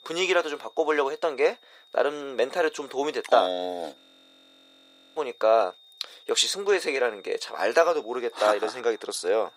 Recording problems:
thin; very; fading below 400 Hz
high-pitched whine; faint; throughout; 3.5 kHz, 25 dB below the speech
audio freezing; at 4 s for 1 s

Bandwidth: 15.5 kHz